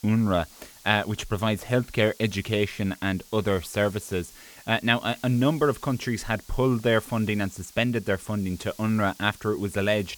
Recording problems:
hiss; faint; throughout; 20 dB below the speech

